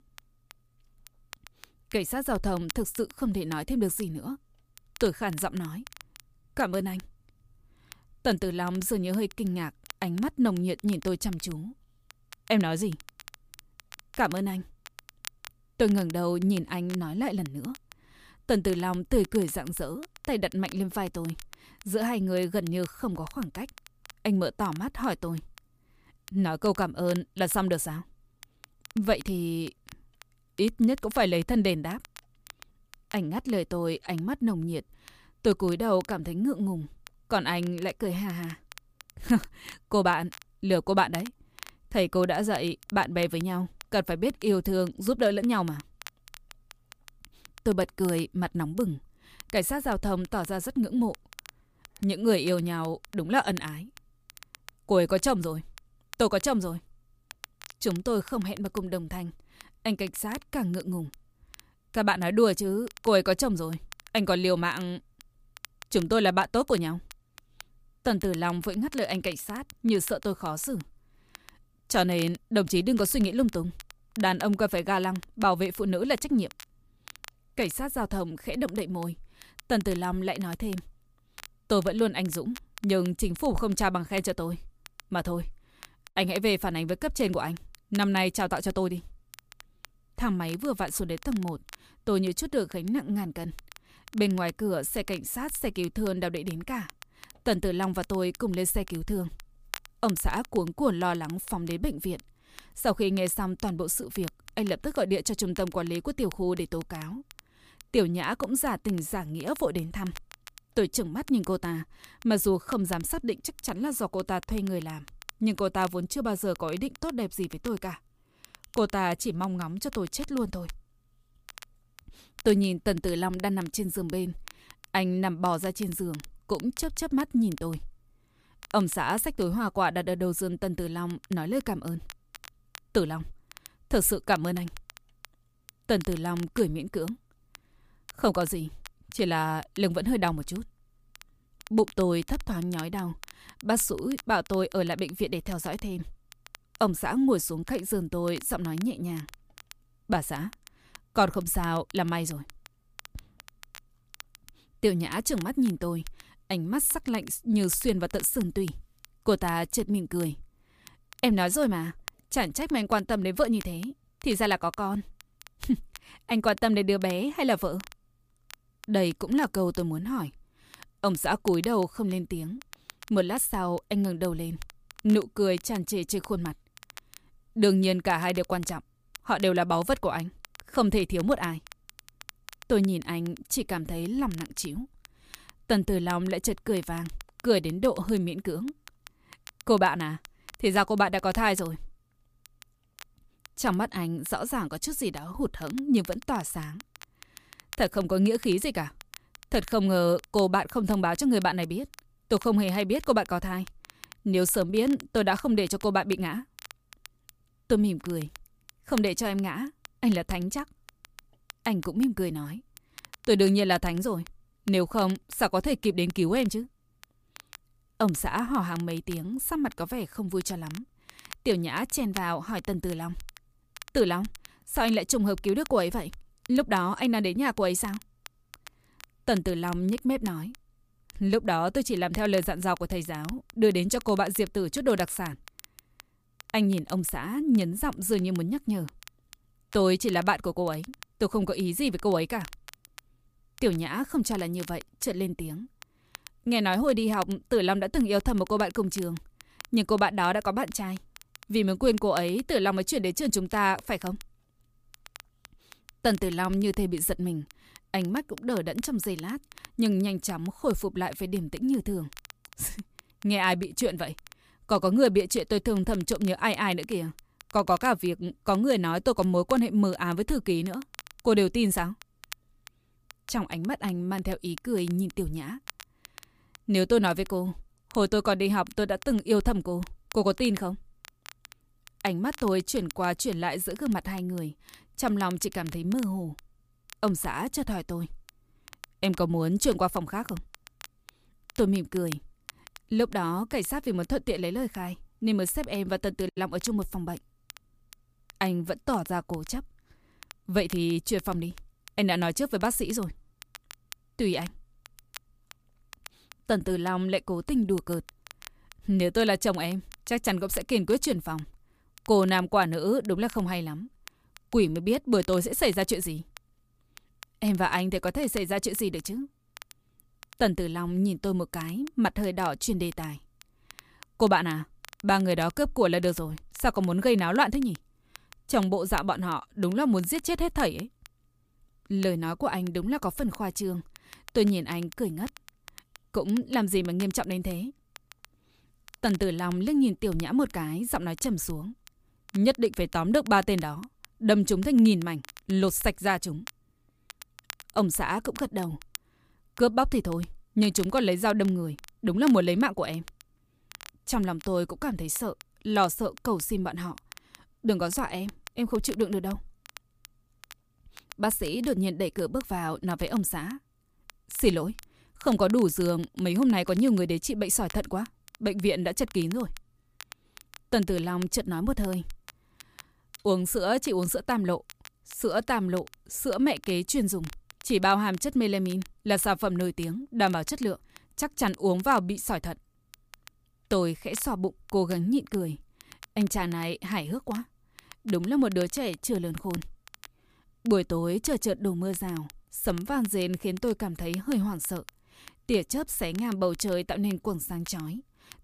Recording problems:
crackle, like an old record; faint; 20 dB below the speech

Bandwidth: 15 kHz